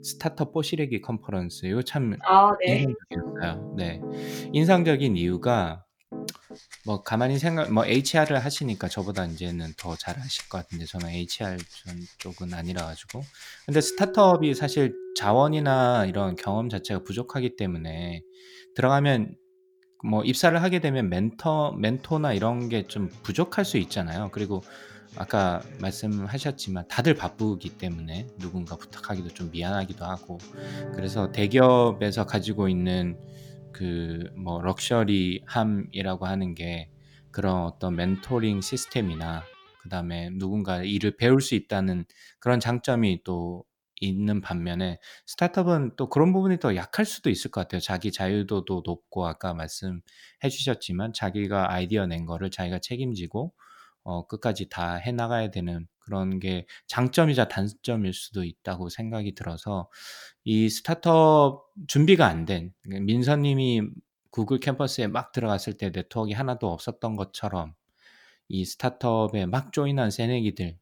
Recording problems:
background music; noticeable; until 40 s; 15 dB below the speech

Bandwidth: 18.5 kHz